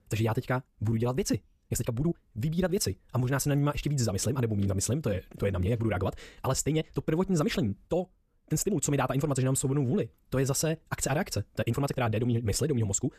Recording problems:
wrong speed, natural pitch; too fast; 1.6 times normal speed
uneven, jittery; strongly; from 0.5 to 12 s

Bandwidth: 14.5 kHz